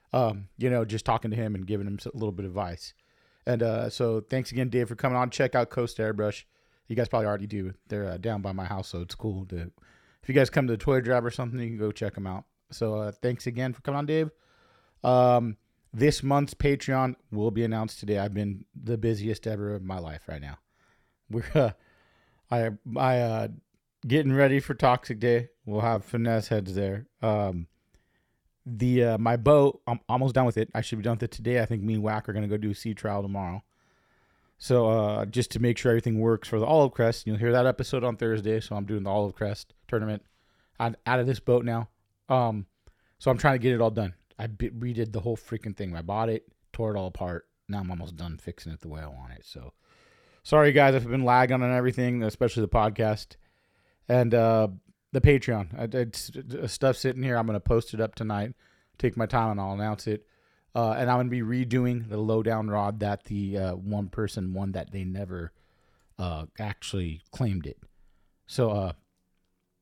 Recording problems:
uneven, jittery; strongly; from 1 s to 1:09

